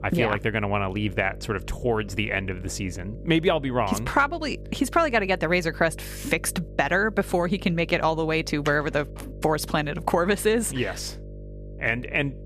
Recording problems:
electrical hum; faint; throughout; 50 Hz, 25 dB below the speech

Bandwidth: 14.5 kHz